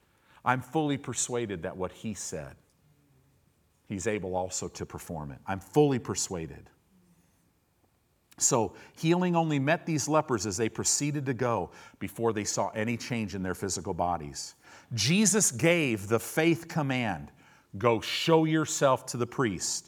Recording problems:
none

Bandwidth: 17 kHz